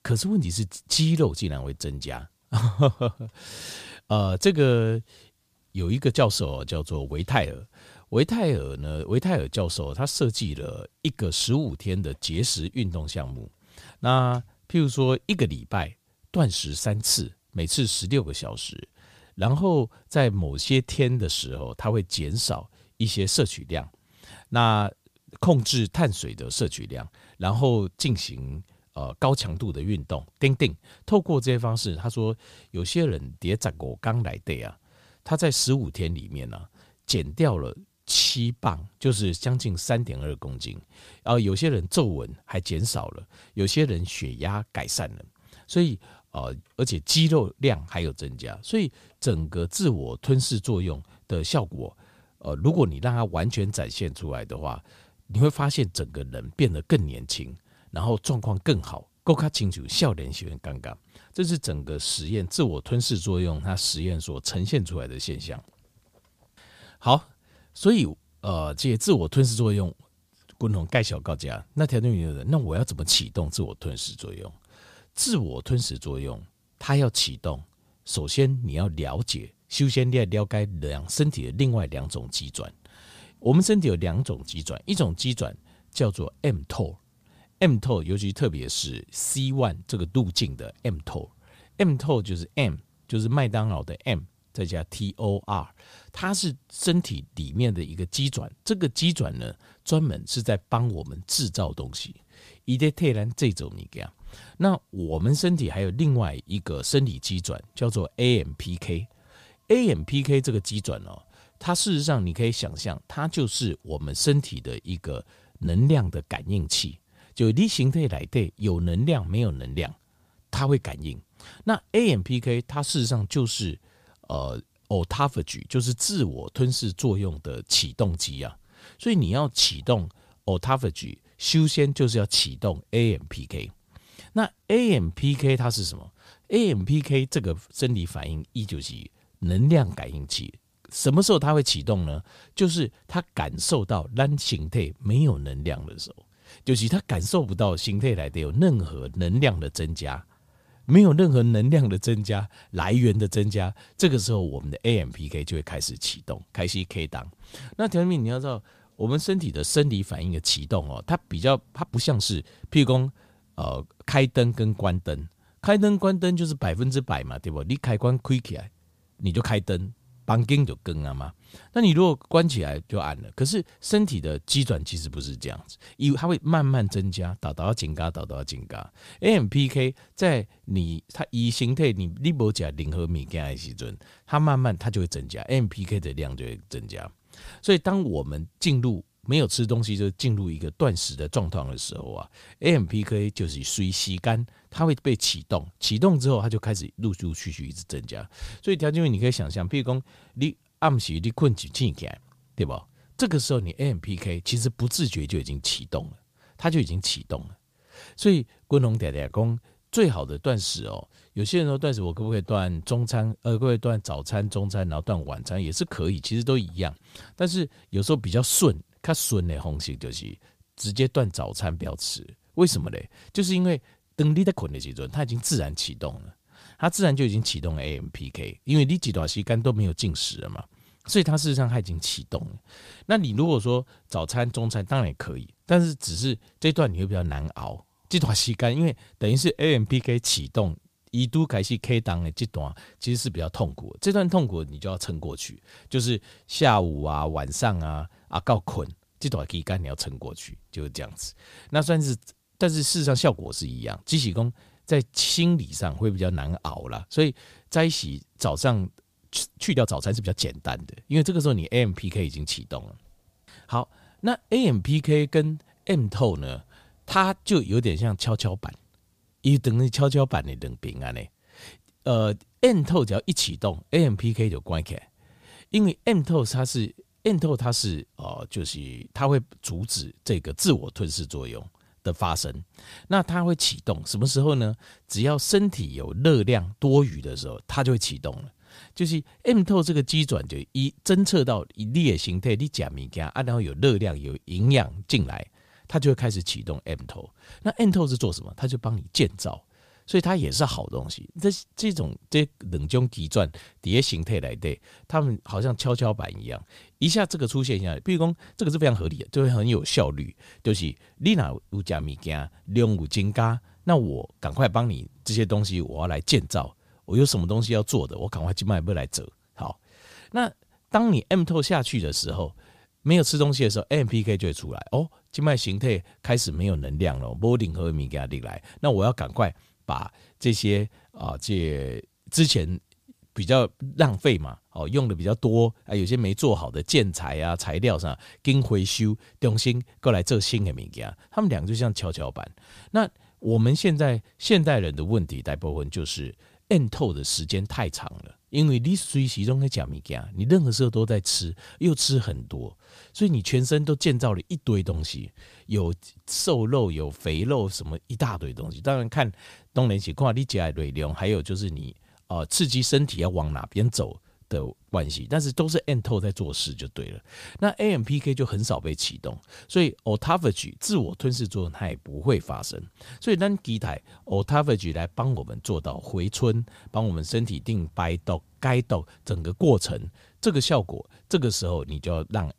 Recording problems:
uneven, jittery; strongly; from 38 s to 6:15

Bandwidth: 15 kHz